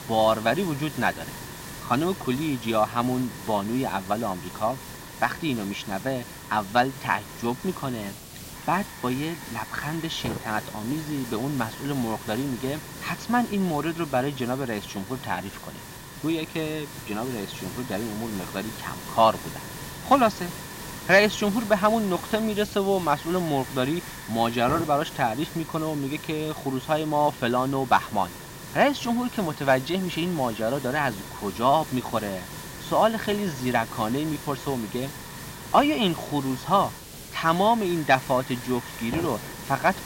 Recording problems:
high frequencies cut off; noticeable; nothing above 7 kHz
hiss; noticeable; throughout; 10 dB below the speech

